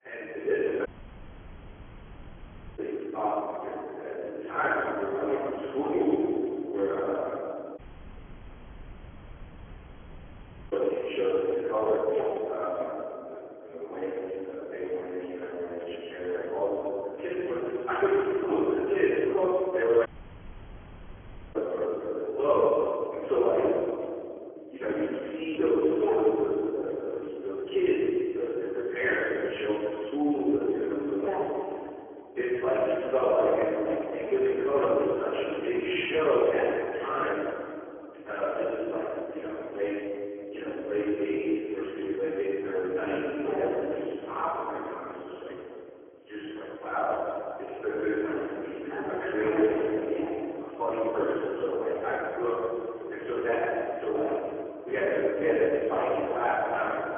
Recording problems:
phone-call audio; poor line; nothing above 3.5 kHz
room echo; strong; dies away in 2.9 s
off-mic speech; far
audio cutting out; at 1 s for 2 s, at 8 s for 3 s and at 20 s for 1.5 s

